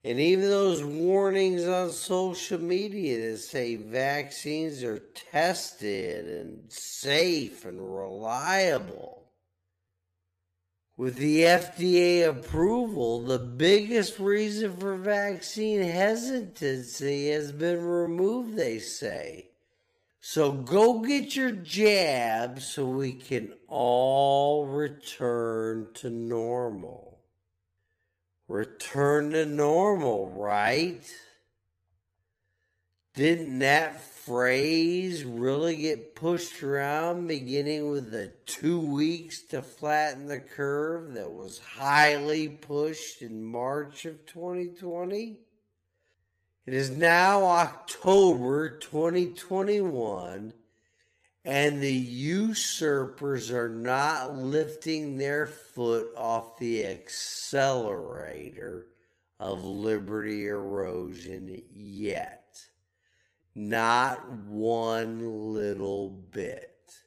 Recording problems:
wrong speed, natural pitch; too slow; 0.5 times normal speed

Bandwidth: 14.5 kHz